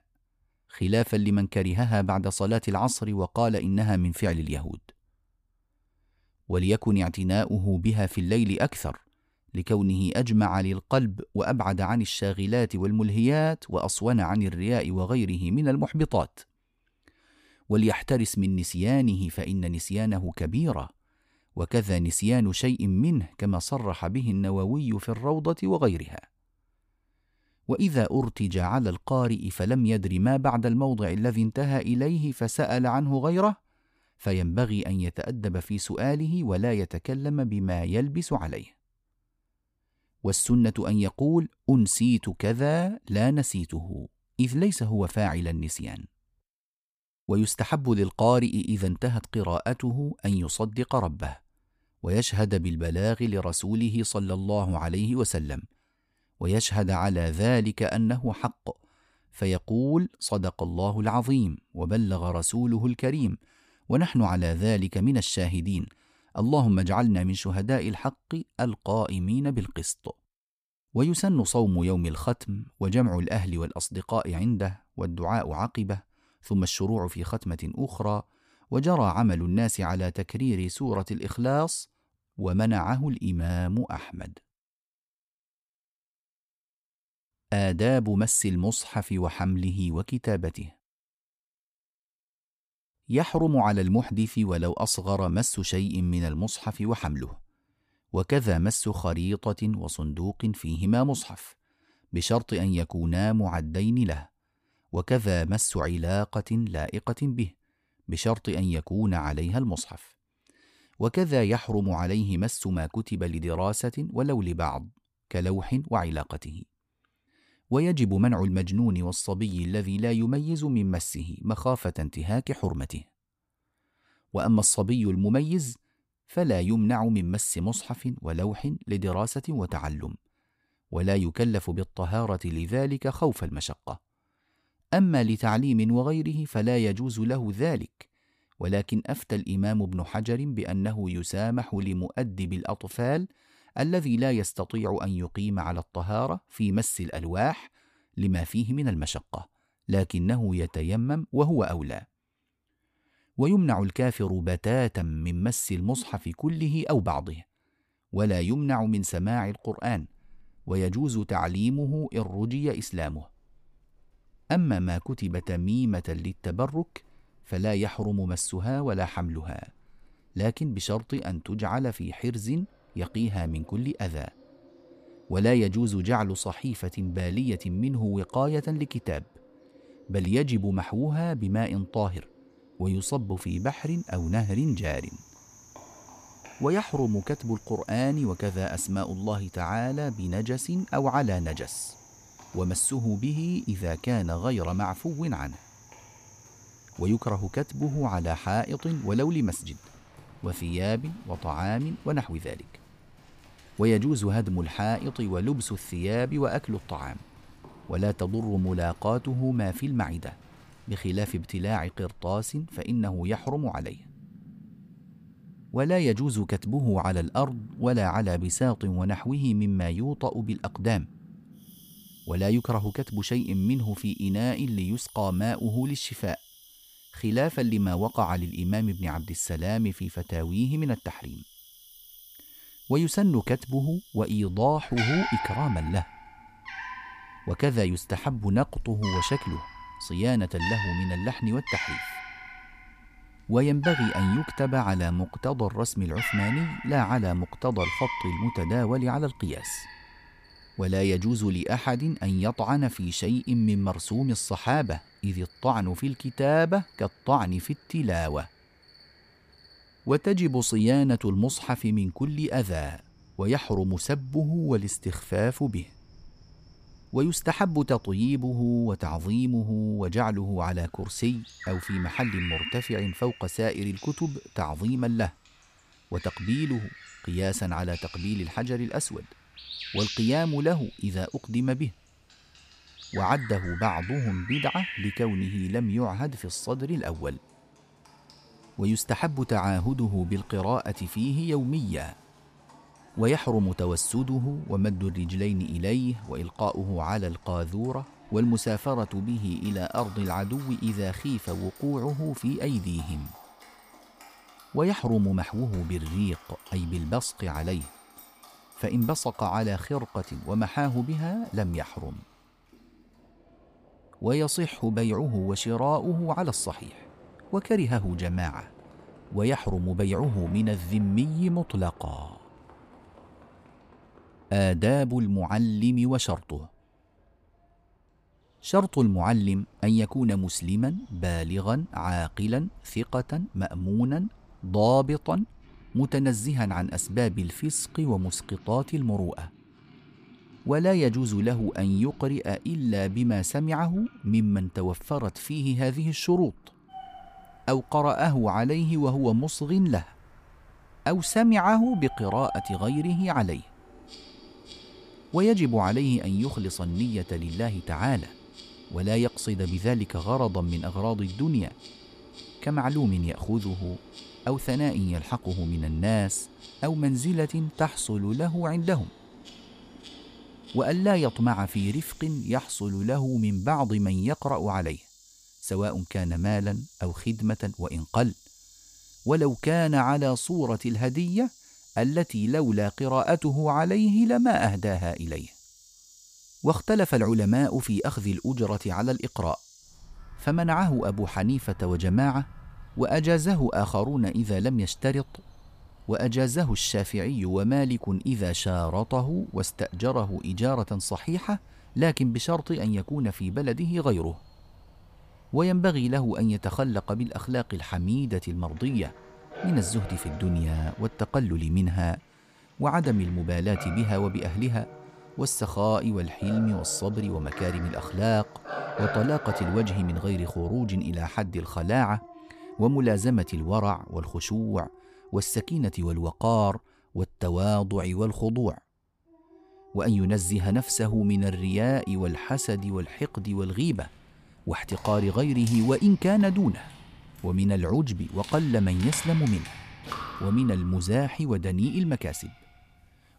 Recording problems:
animal sounds; noticeable; from 2:40 on; 15 dB below the speech

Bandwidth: 15 kHz